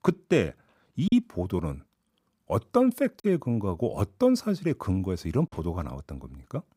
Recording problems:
choppy; occasionally; at 1 s, at 3 s and at 5.5 s; 3% of the speech affected

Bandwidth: 15.5 kHz